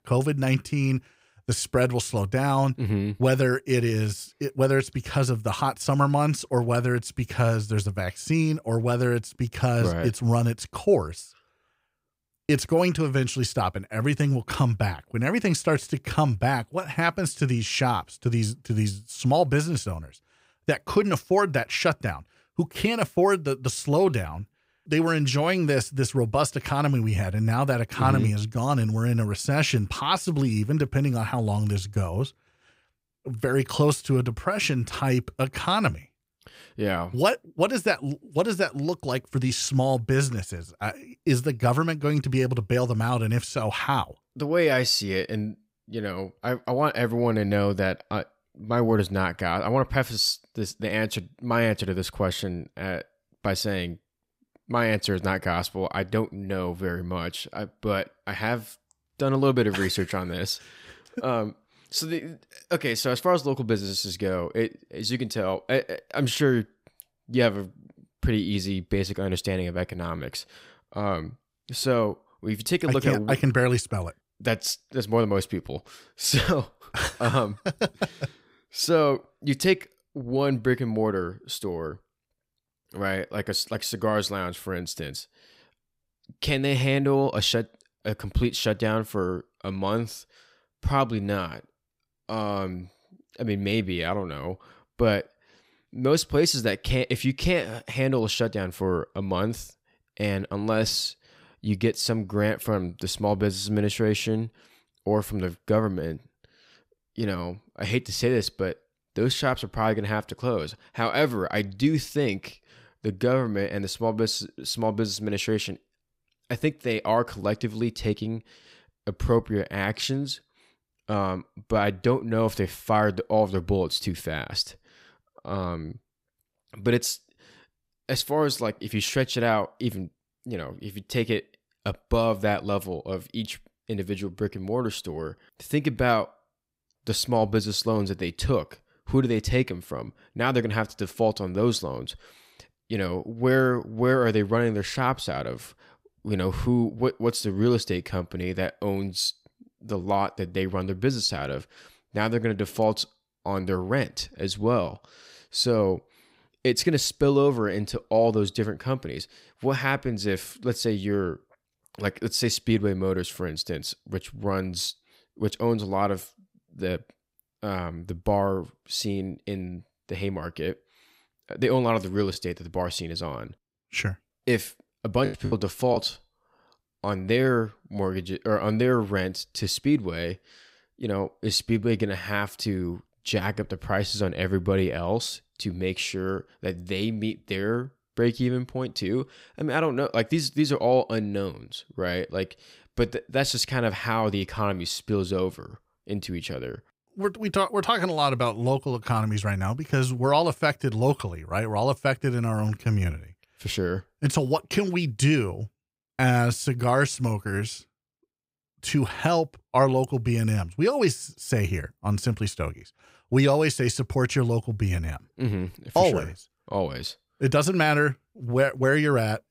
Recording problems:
choppy; very; from 2:52 to 2:56; 6% of the speech affected

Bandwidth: 15.5 kHz